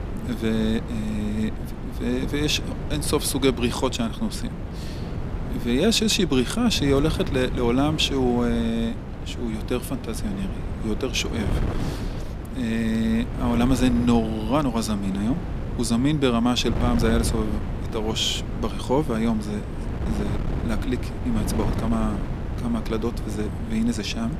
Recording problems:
wind noise on the microphone; occasional gusts; 10 dB below the speech

